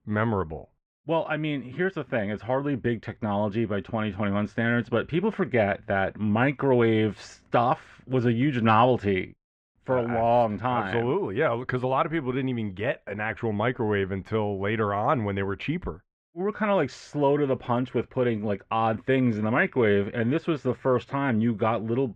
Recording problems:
muffled; very; fading above 2 kHz

